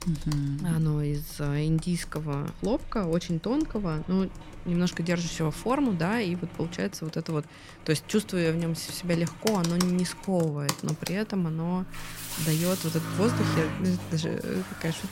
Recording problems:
household noises; loud; throughout; 9 dB below the speech
traffic noise; noticeable; throughout; 10 dB below the speech

